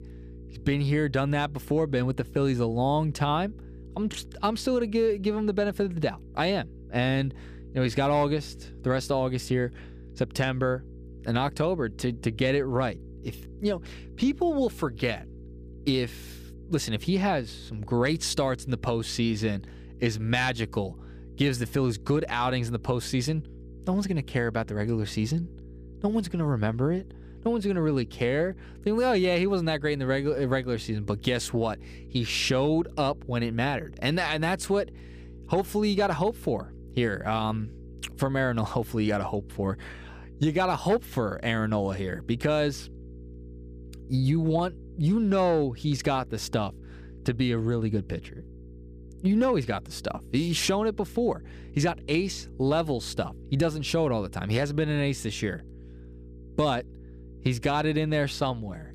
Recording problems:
electrical hum; faint; throughout; 60 Hz, 25 dB below the speech

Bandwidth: 15 kHz